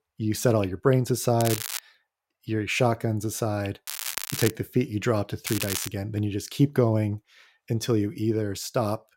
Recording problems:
crackling; loud; at 1.5 s, at 4 s and at 5.5 s; 6 dB below the speech

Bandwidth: 16 kHz